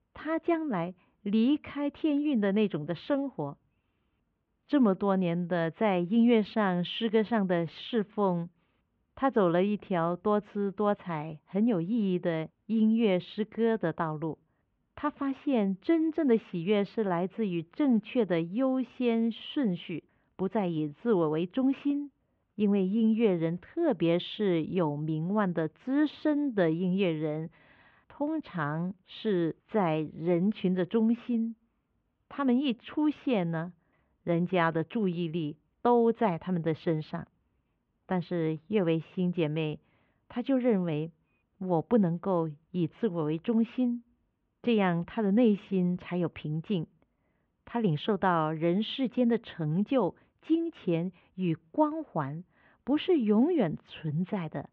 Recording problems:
muffled; very; fading above 3 kHz

